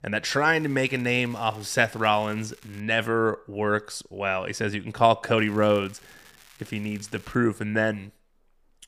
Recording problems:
crackling; faint; from 0.5 to 3 s and from 5.5 to 7.5 s; 25 dB below the speech

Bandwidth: 15 kHz